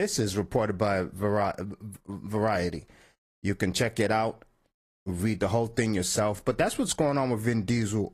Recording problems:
garbled, watery; slightly; nothing above 14.5 kHz
abrupt cut into speech; at the start

